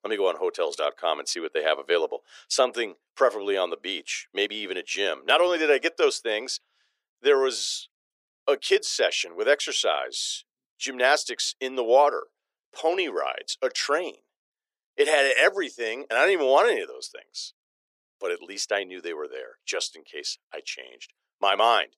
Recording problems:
thin; very; fading below 400 Hz

